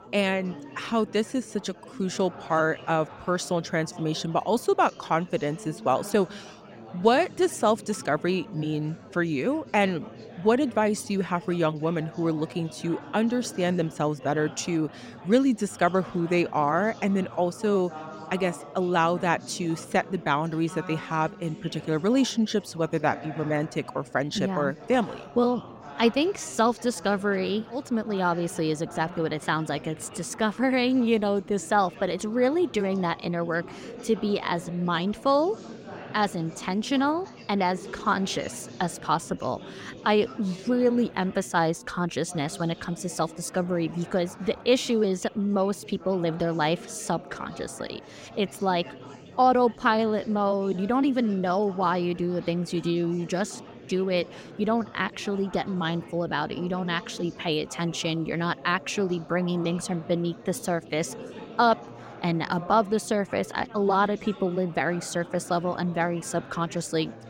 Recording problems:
chatter from many people; noticeable; throughout; 15 dB below the speech

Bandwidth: 16 kHz